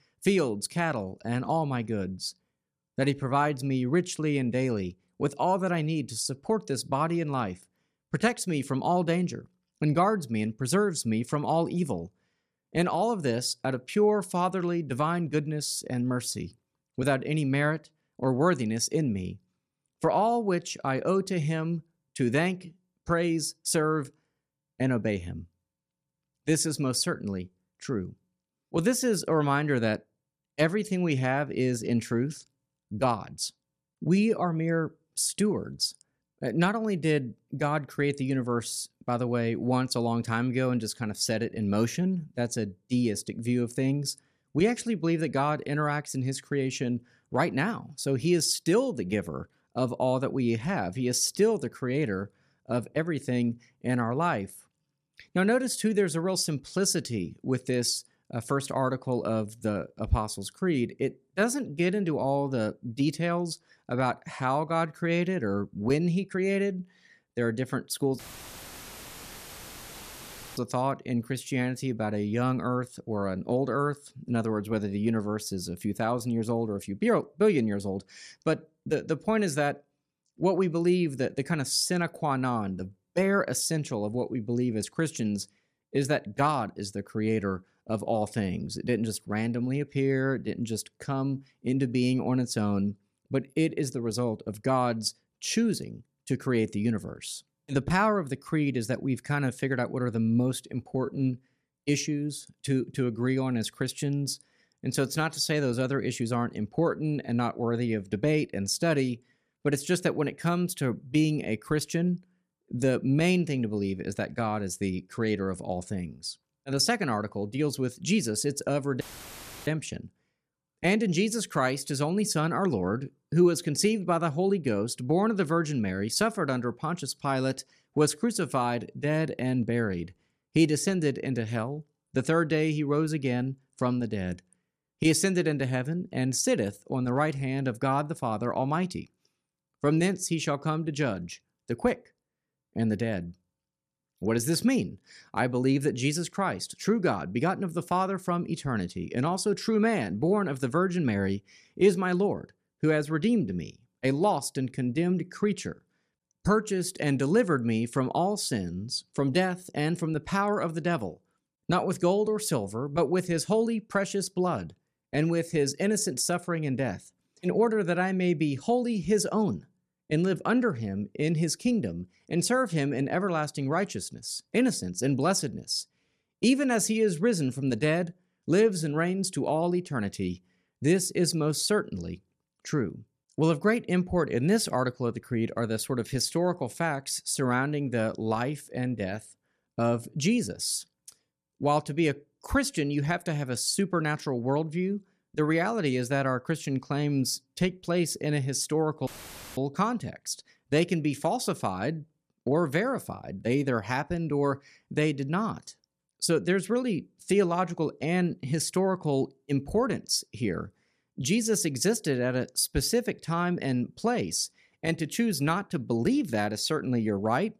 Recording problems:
uneven, jittery; slightly; from 1 s to 3:23
audio cutting out; filled with static; at 1:08 for 2.5 s, at 1:59 for 0.5 s and at 3:19 for 0.5 s

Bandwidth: 14.5 kHz